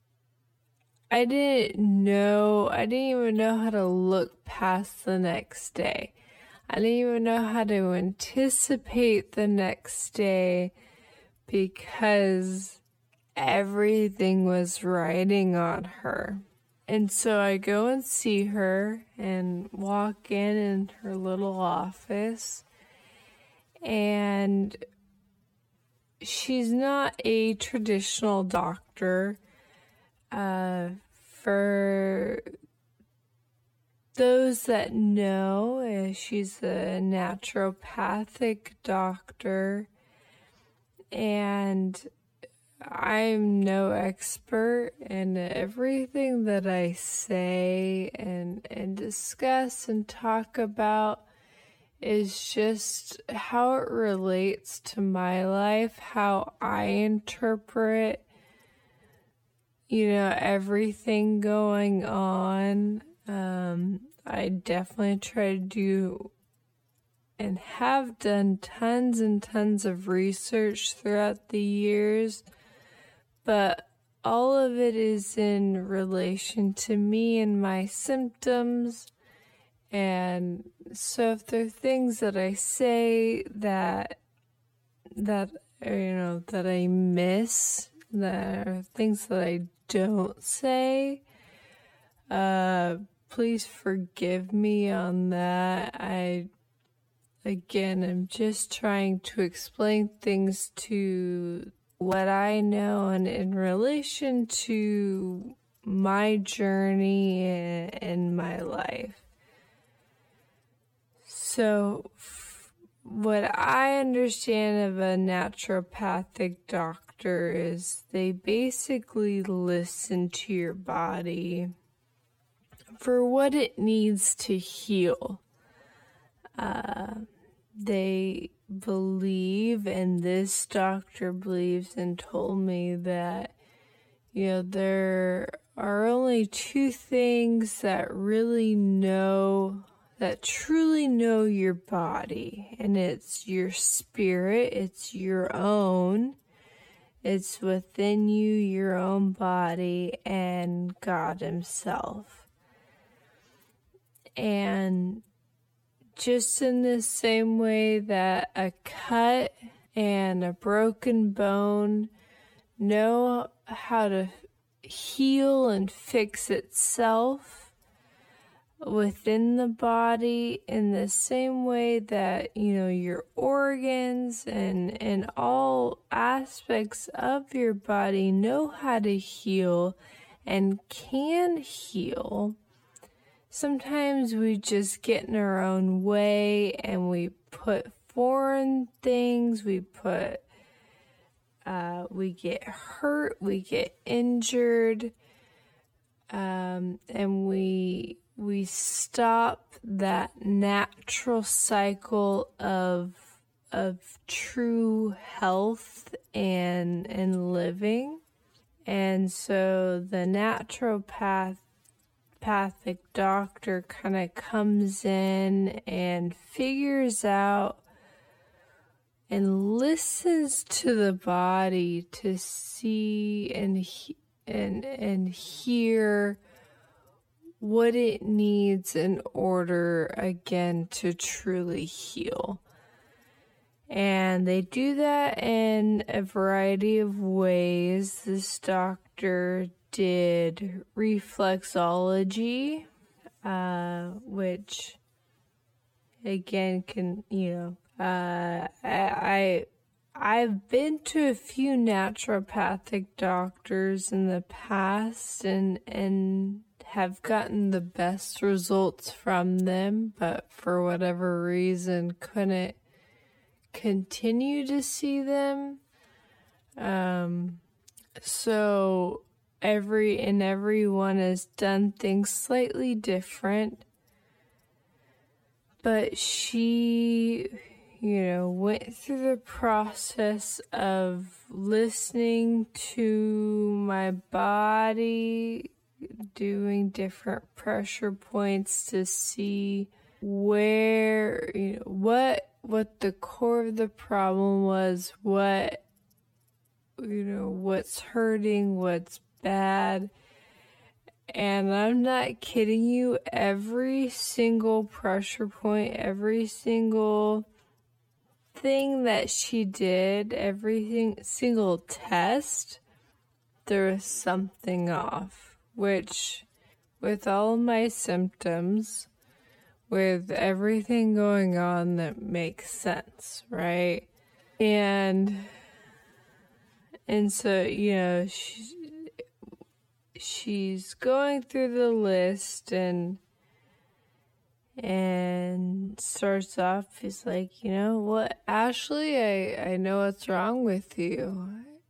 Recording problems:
wrong speed, natural pitch; too slow; 0.5 times normal speed

